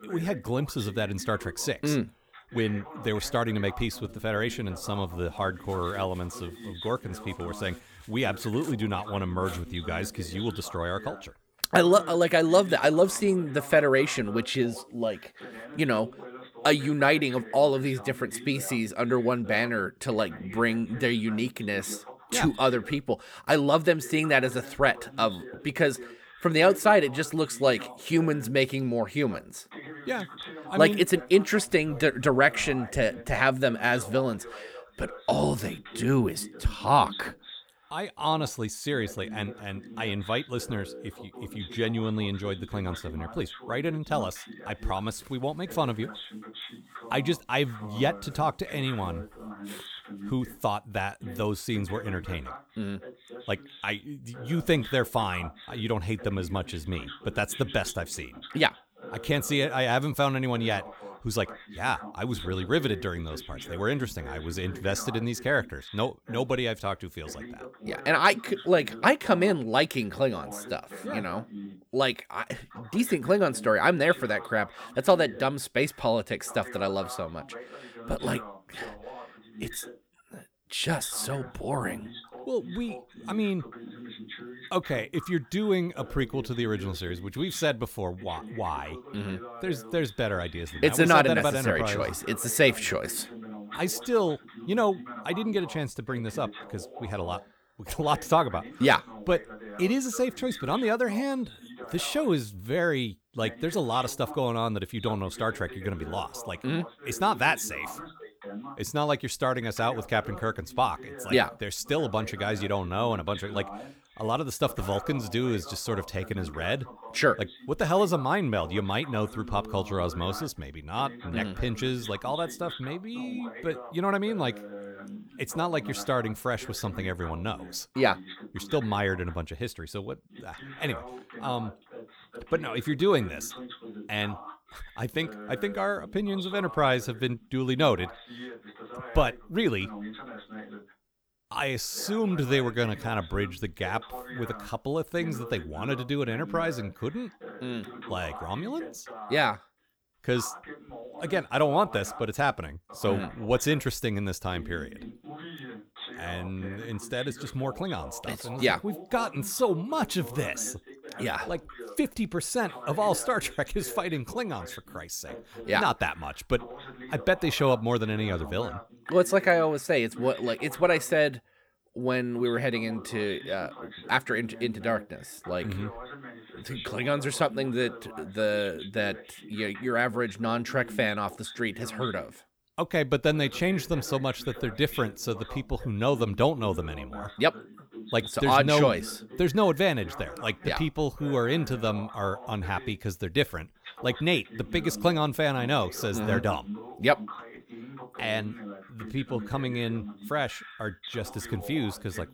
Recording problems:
voice in the background; noticeable; throughout; 15 dB below the speech

